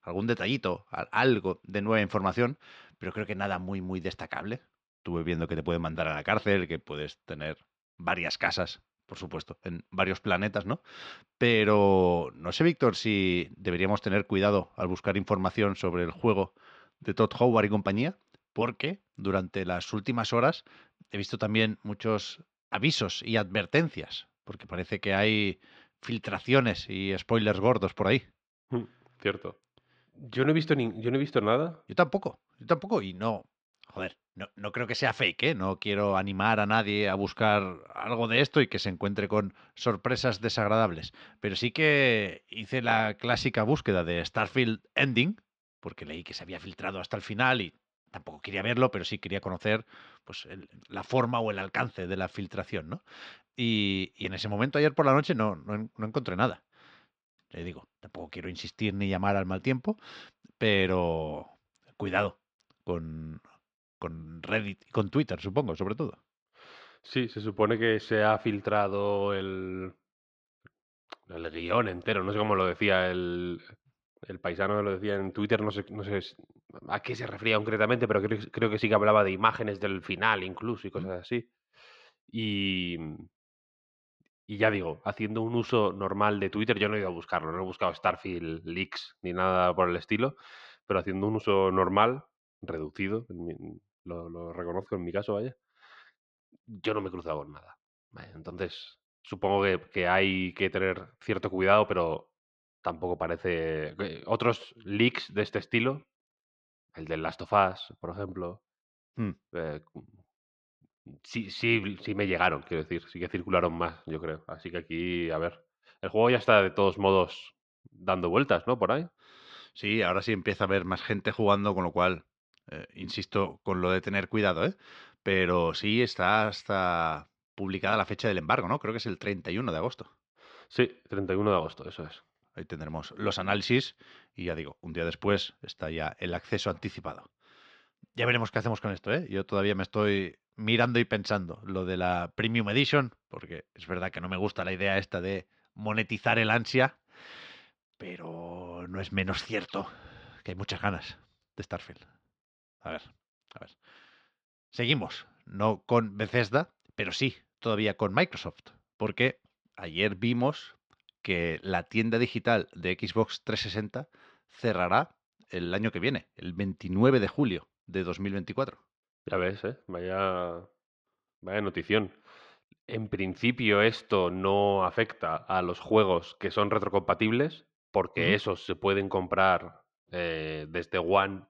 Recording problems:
muffled; very slightly; fading above 4.5 kHz

